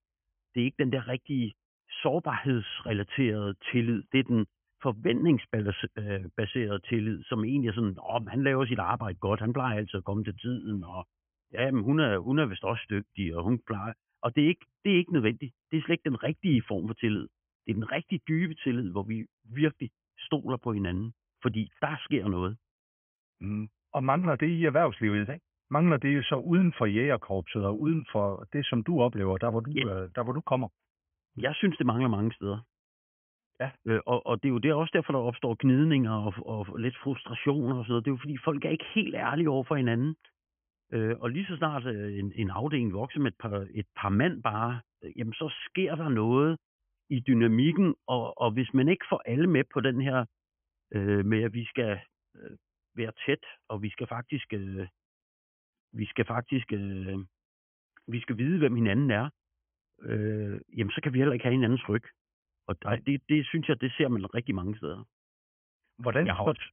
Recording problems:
high frequencies cut off; severe; nothing above 3 kHz

